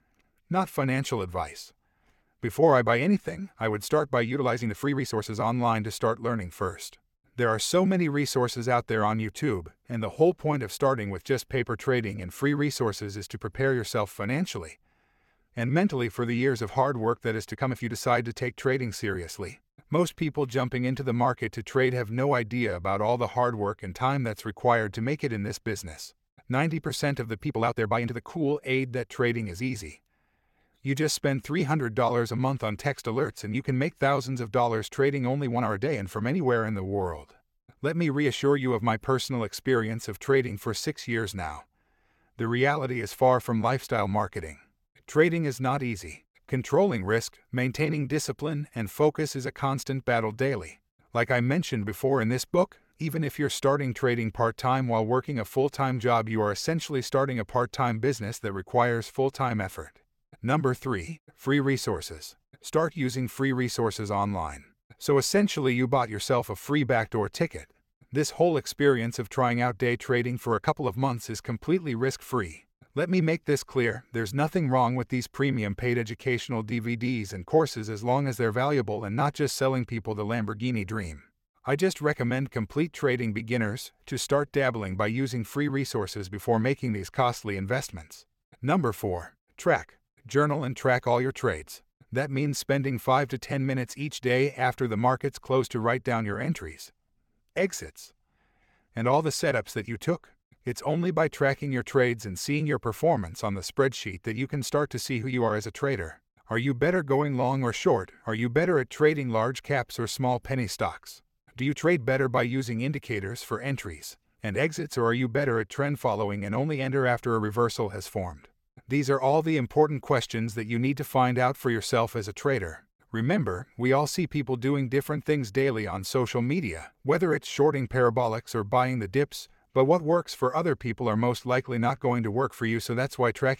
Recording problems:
uneven, jittery; strongly; from 4.5 s to 1:52

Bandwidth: 16.5 kHz